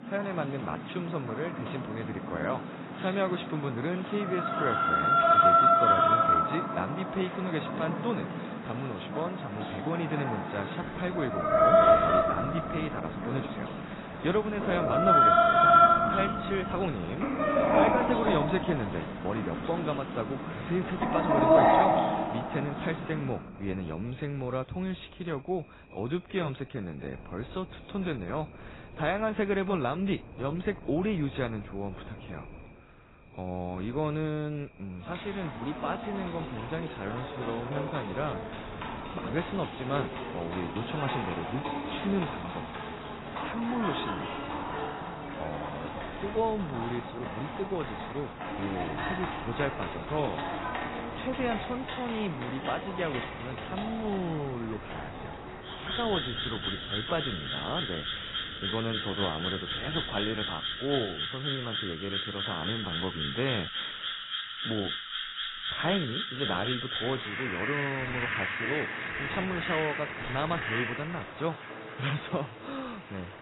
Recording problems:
garbled, watery; badly; nothing above 4 kHz
animal sounds; very loud; throughout; 5 dB above the speech
wind noise on the microphone; occasional gusts; from 11 s to 1:01; 20 dB below the speech

